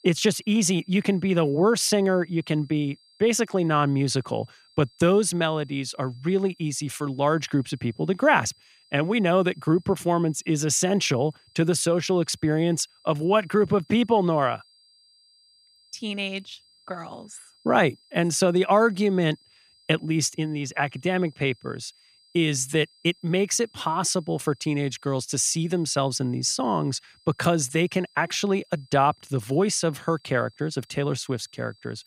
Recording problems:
high-pitched whine; faint; throughout; 5 kHz, 30 dB below the speech

